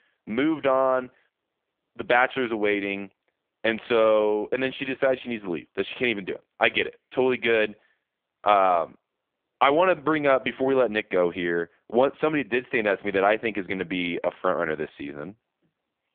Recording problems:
phone-call audio; poor line; nothing above 3.5 kHz

